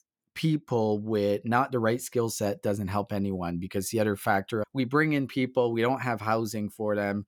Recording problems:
none

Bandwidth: 18.5 kHz